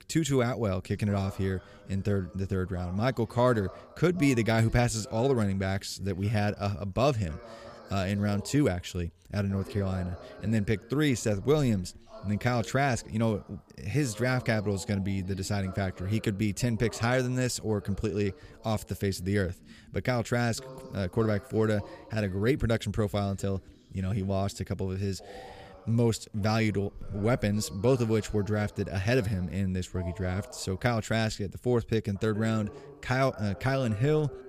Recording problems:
voice in the background; noticeable; throughout; 20 dB below the speech

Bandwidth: 15 kHz